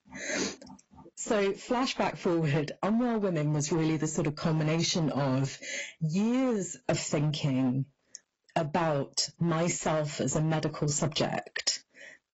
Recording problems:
garbled, watery; badly; nothing above 7.5 kHz
distortion; slight; 9% of the sound clipped
squashed, flat; somewhat

